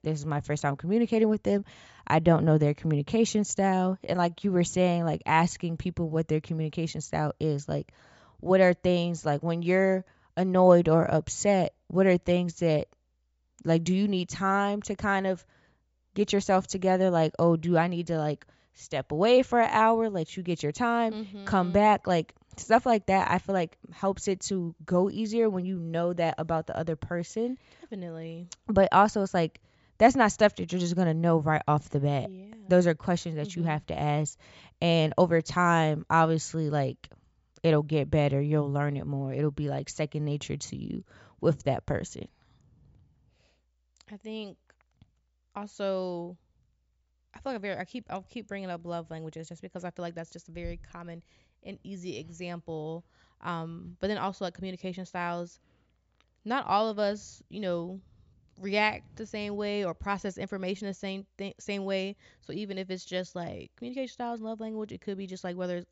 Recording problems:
high frequencies cut off; noticeable; nothing above 8 kHz

